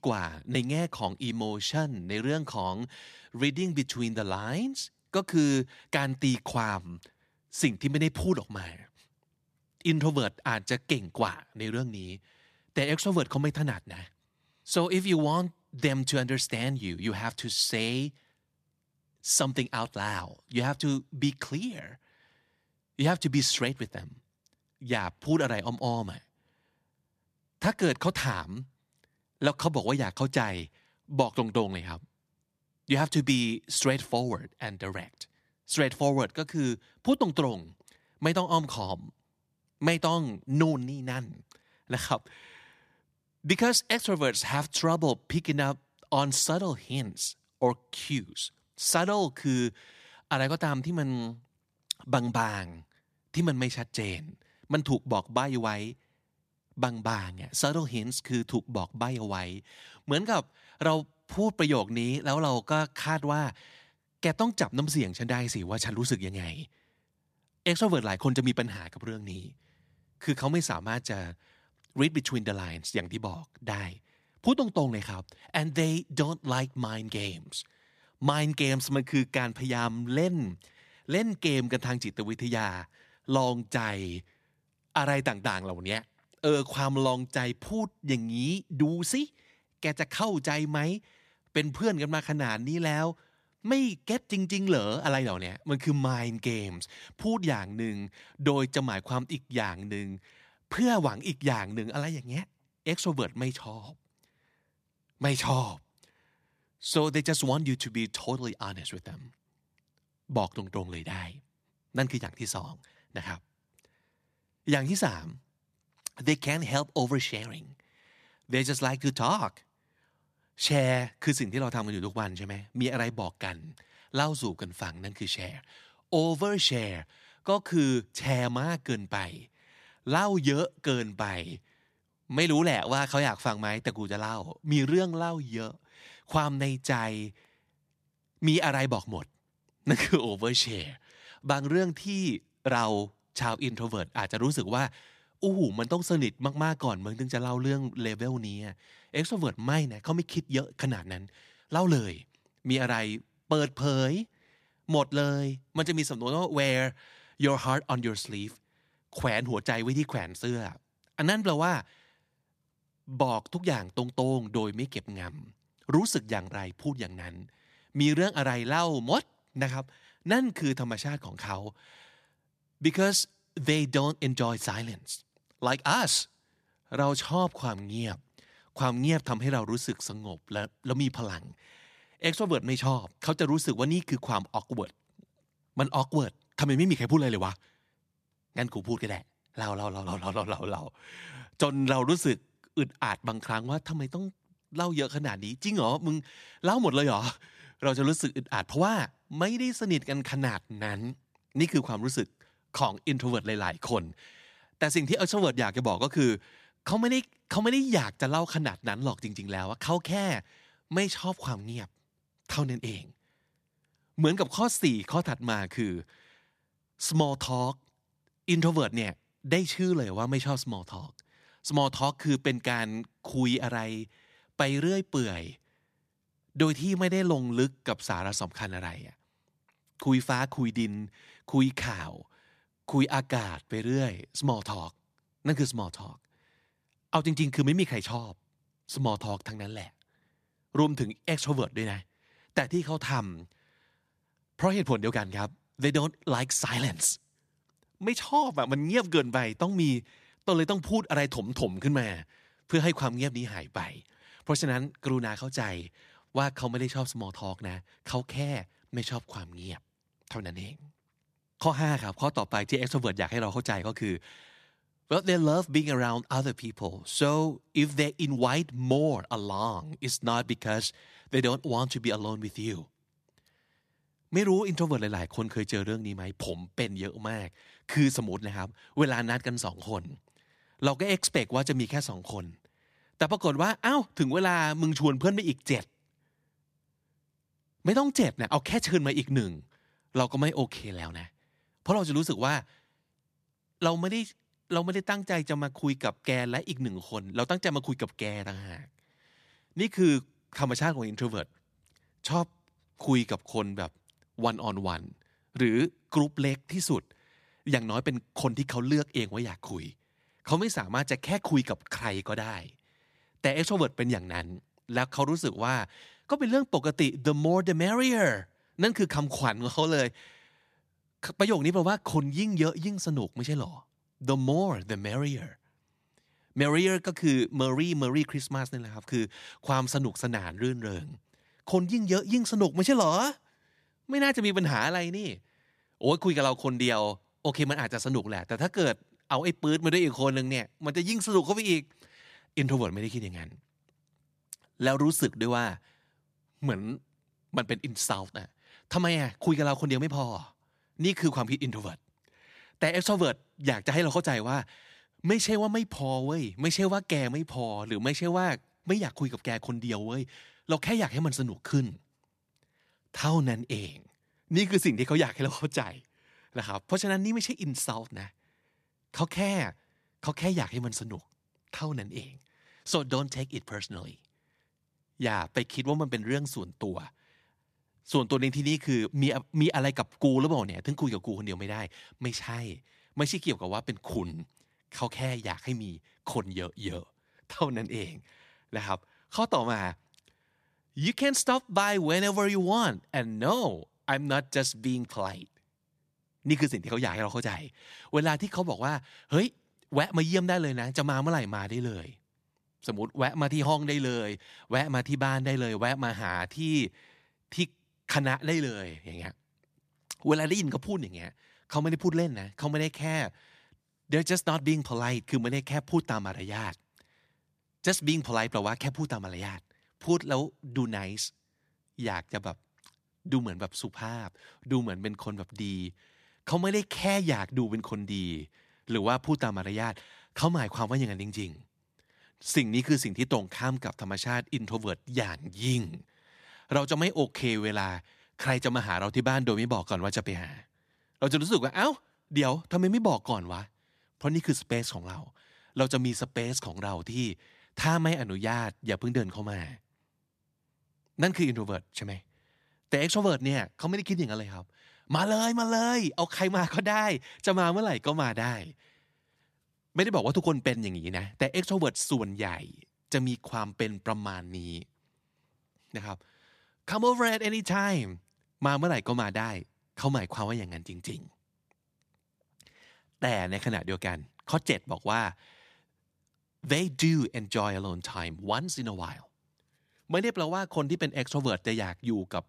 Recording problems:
none

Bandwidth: 14.5 kHz